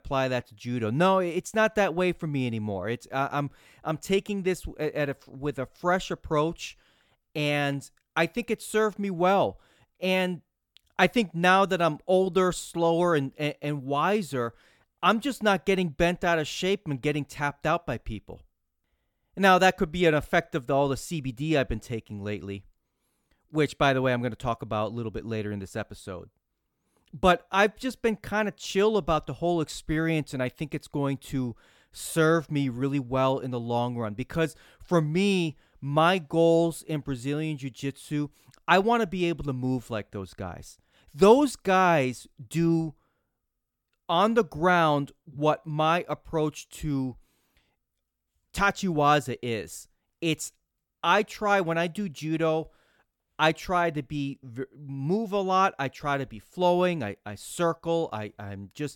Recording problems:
none

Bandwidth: 17 kHz